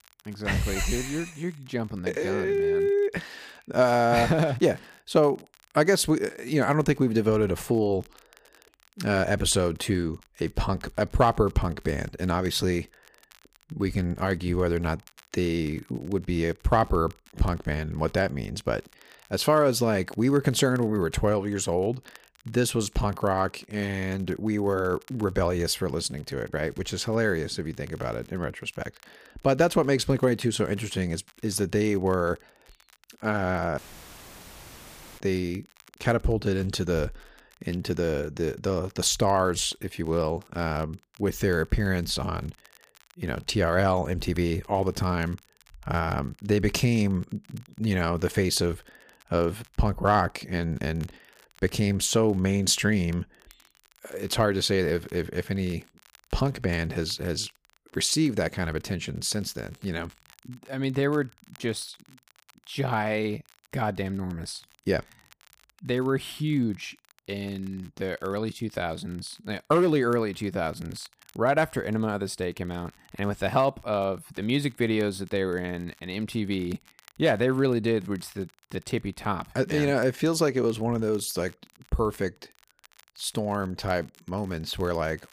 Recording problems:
crackle, like an old record; faint; 30 dB below the speech
audio cutting out; filled with static; at 34 s for 1.5 s

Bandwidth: 15 kHz